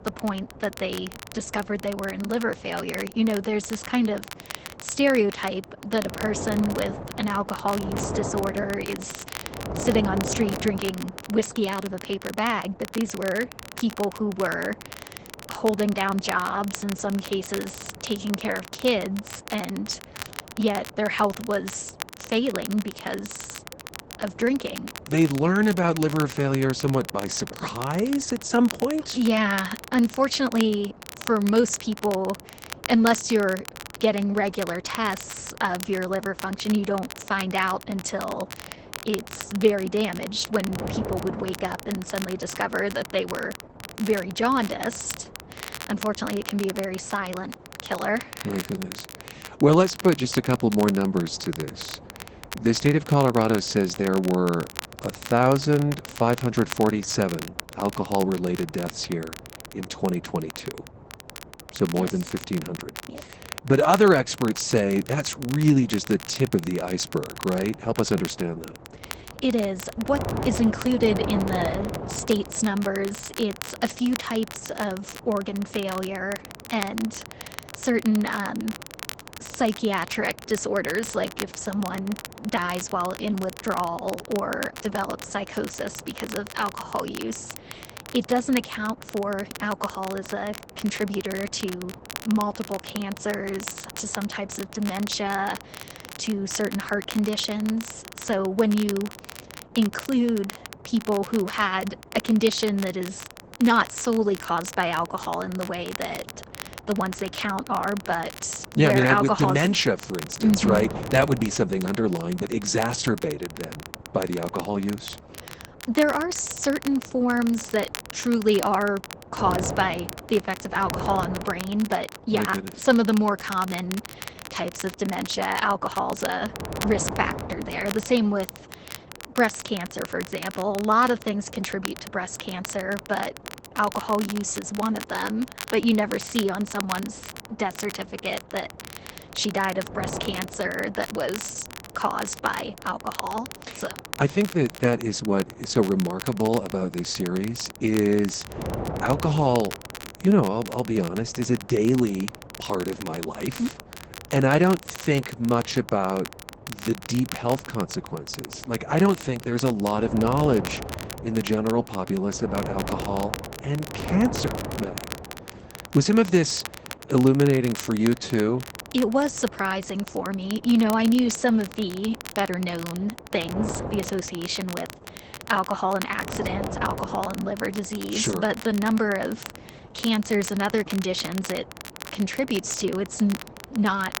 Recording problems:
garbled, watery; badly; nothing above 8 kHz
wind noise on the microphone; occasional gusts; 15 dB below the speech
crackle, like an old record; noticeable; 15 dB below the speech

